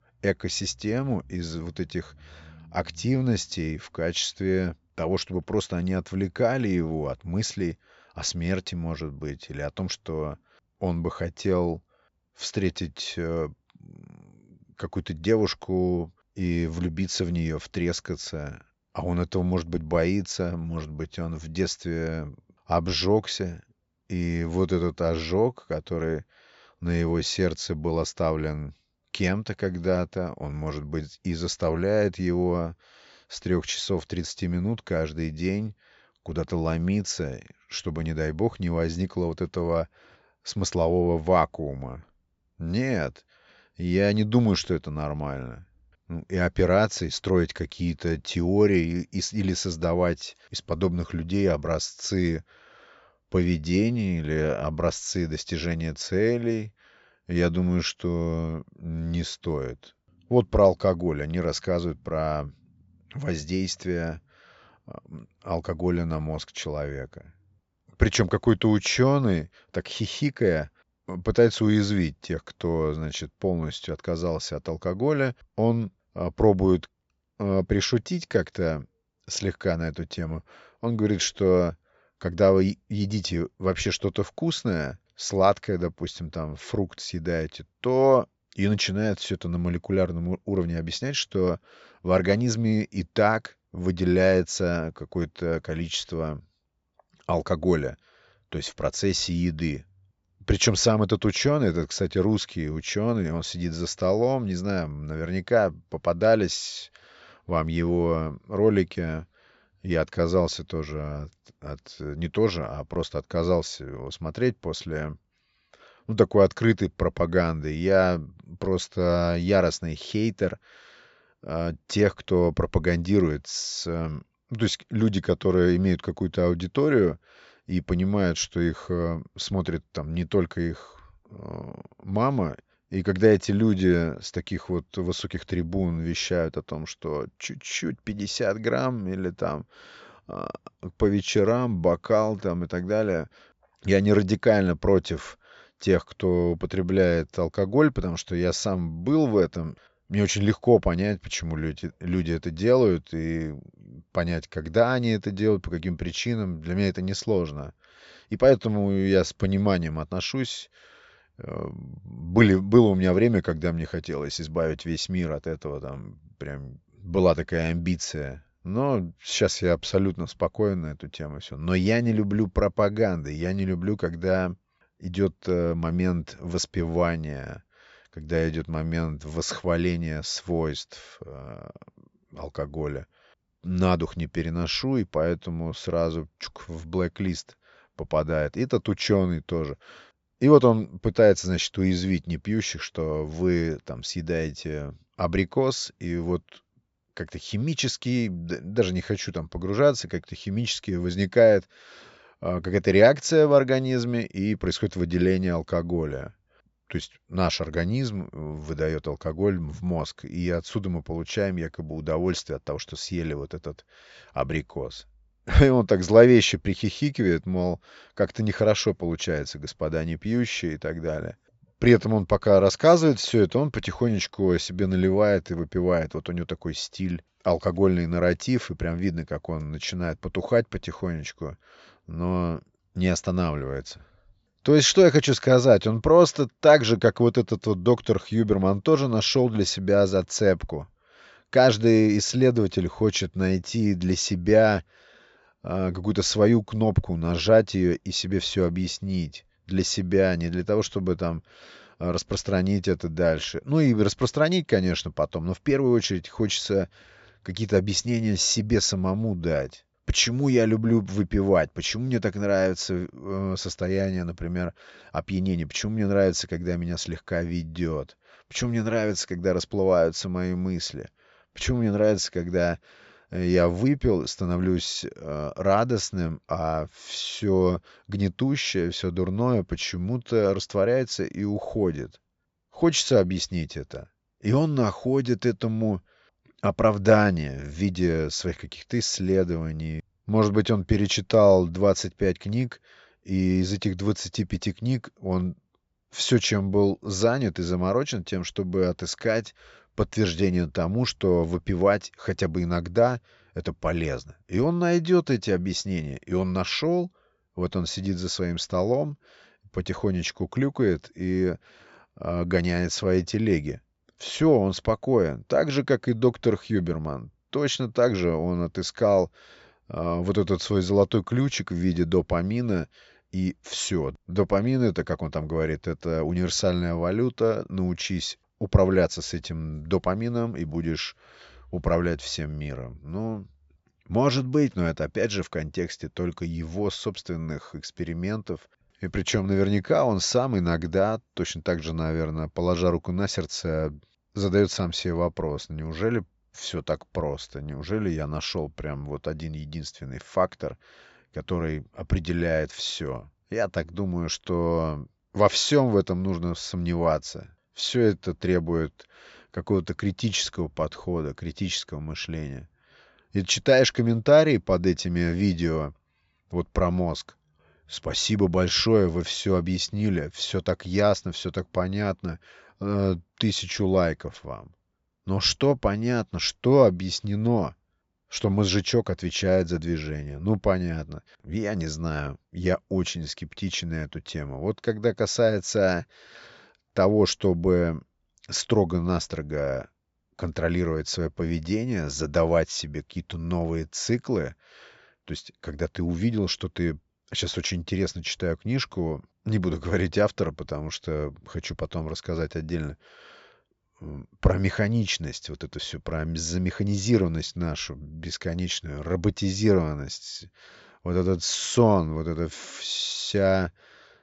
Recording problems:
high frequencies cut off; noticeable; nothing above 8 kHz

